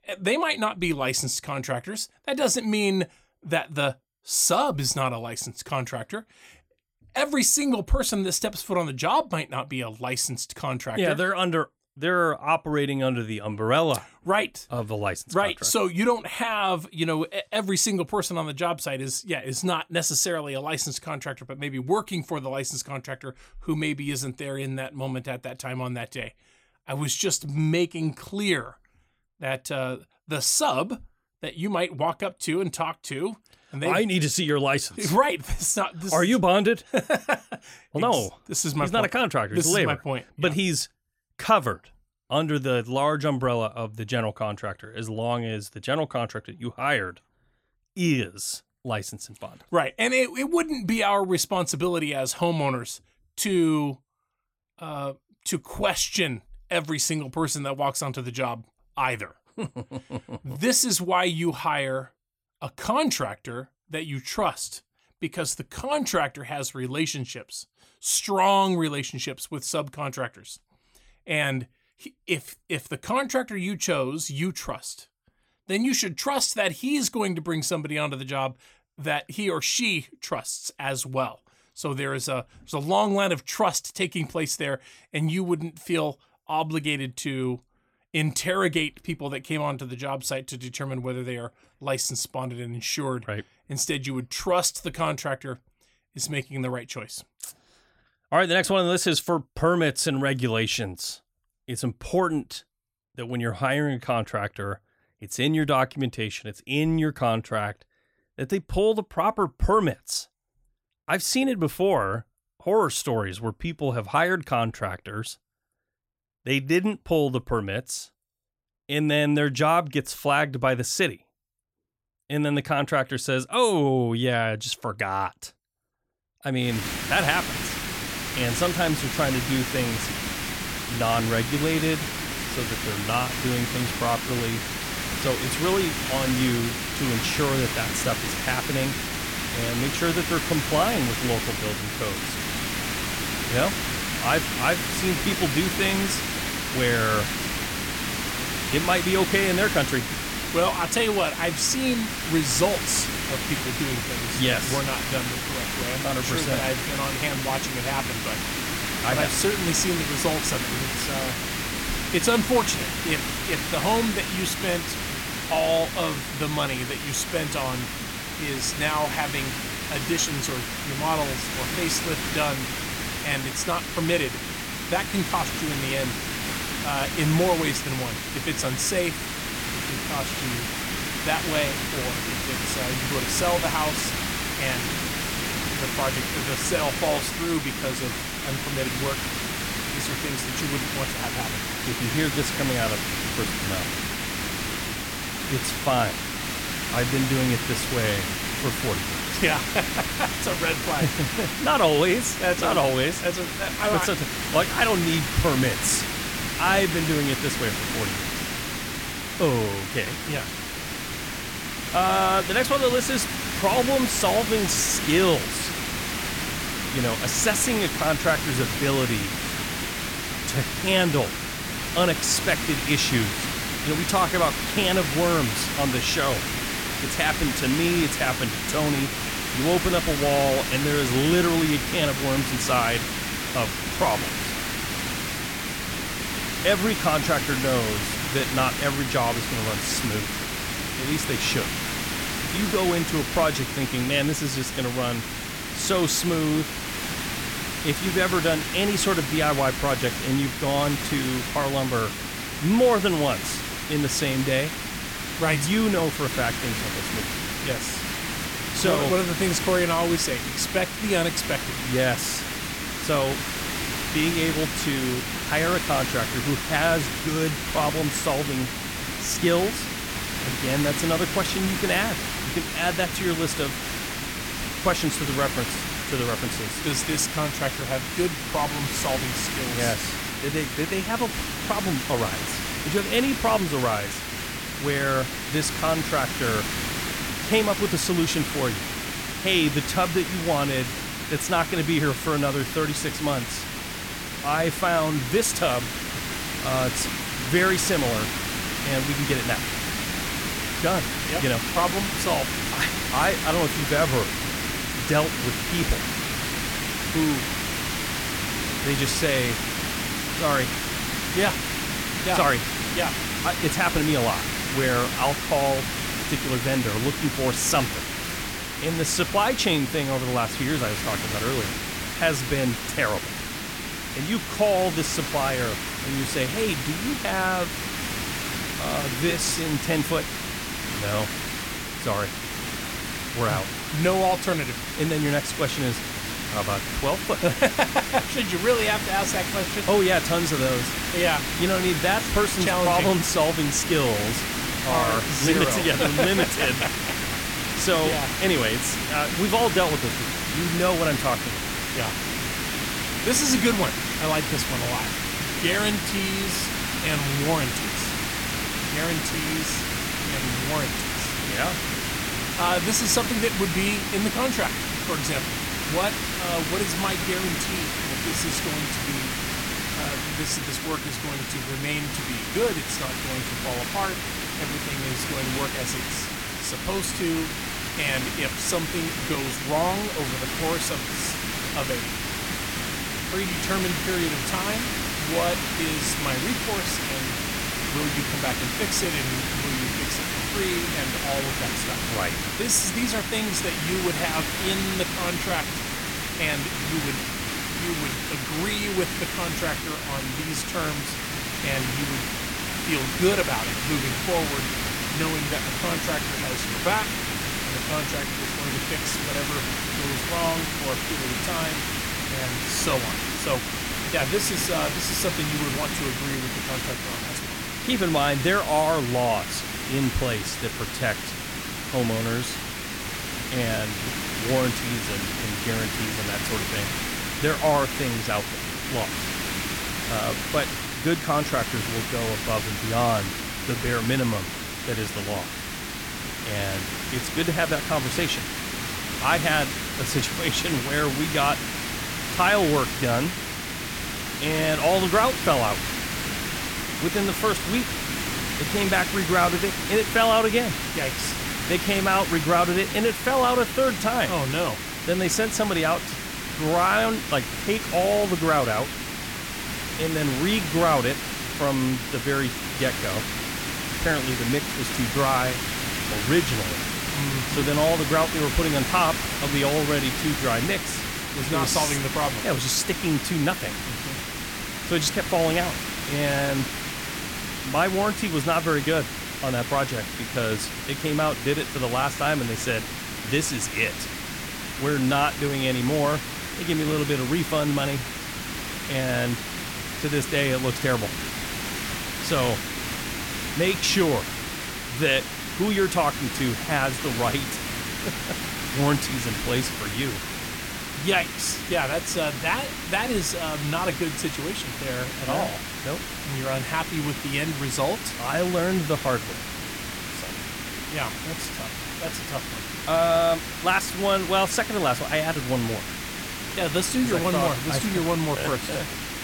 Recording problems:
hiss; loud; from 2:07 on; 2 dB below the speech

